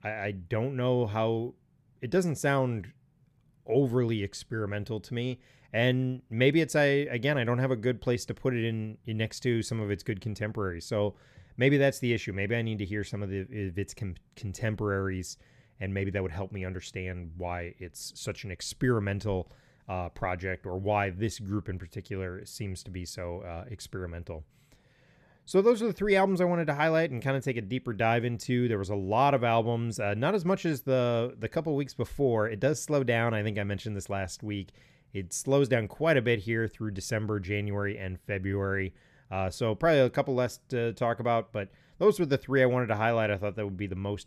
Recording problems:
none

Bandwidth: 14 kHz